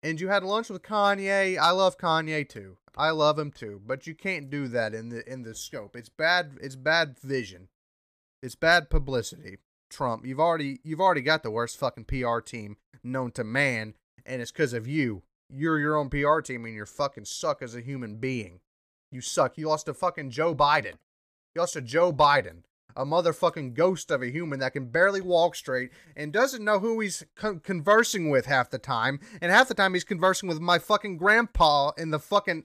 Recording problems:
none

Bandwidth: 14.5 kHz